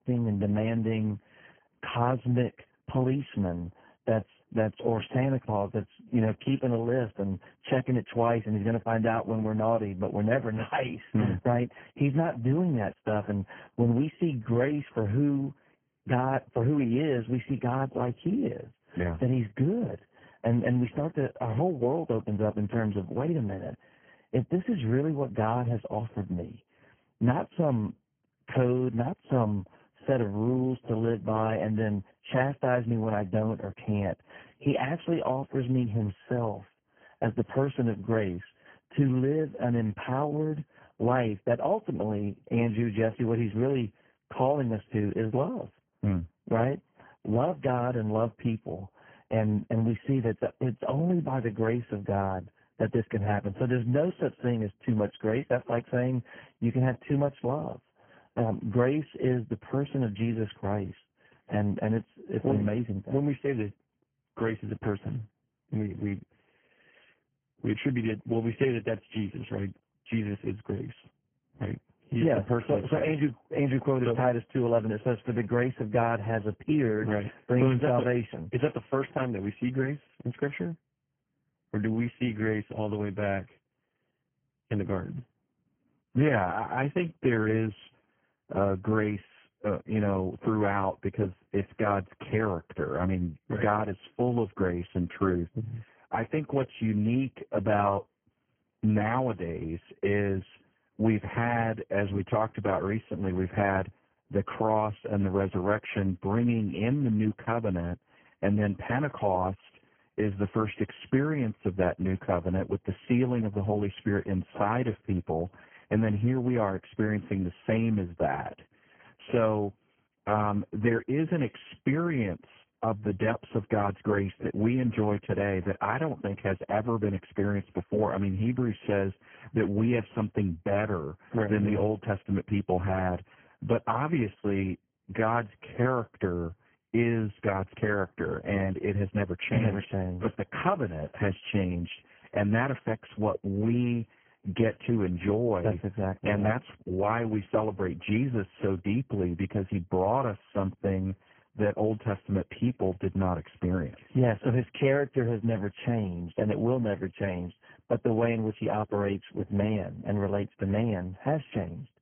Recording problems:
garbled, watery; badly
high frequencies cut off; severe; nothing above 3 kHz

